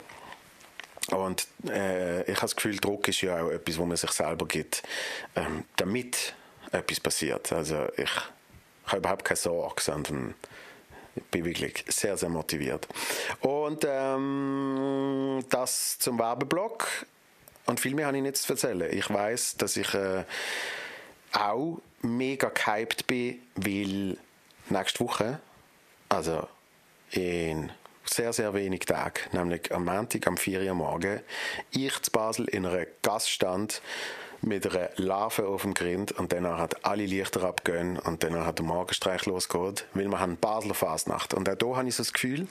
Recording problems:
squashed, flat; heavily
thin; somewhat; fading below 400 Hz

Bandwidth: 14.5 kHz